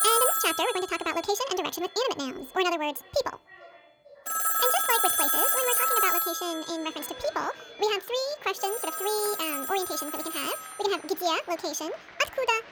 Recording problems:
wrong speed and pitch; too fast and too high; 1.7 times normal speed
echo of what is said; faint; throughout; 440 ms later, 25 dB below the speech
alarms or sirens; very loud; throughout; 4 dB above the speech
crowd noise; noticeable; from 7 s on; 20 dB below the speech

